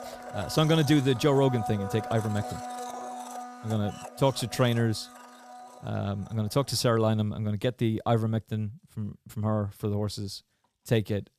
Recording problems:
household noises; noticeable; throughout; 10 dB below the speech

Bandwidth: 14.5 kHz